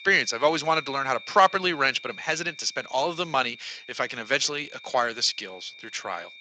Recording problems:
thin; very; fading below 750 Hz
garbled, watery; slightly
high-pitched whine; noticeable; throughout; 2.5 kHz, 20 dB below the speech

